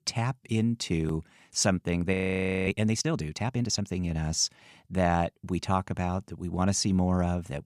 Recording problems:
audio freezing; at 2 s for 0.5 s

